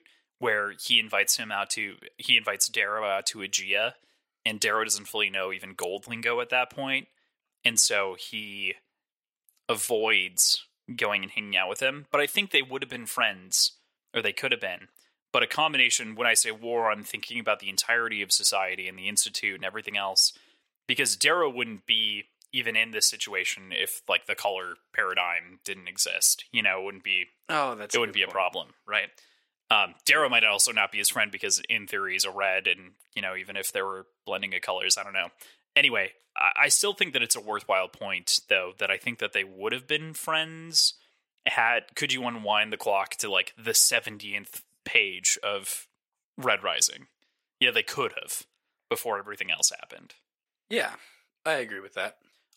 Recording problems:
thin; very; fading below 500 Hz

